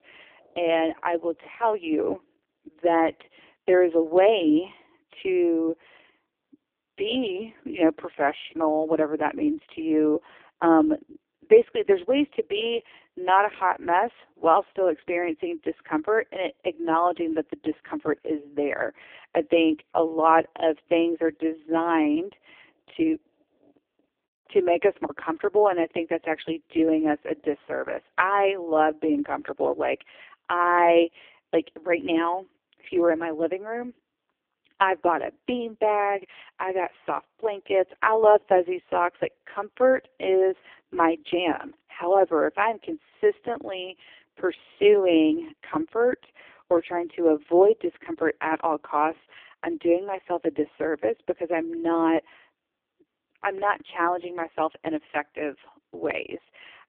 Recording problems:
phone-call audio; poor line; nothing above 3 kHz

